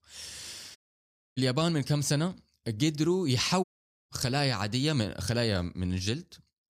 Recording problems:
audio cutting out; at 1 s for 0.5 s and at 3.5 s

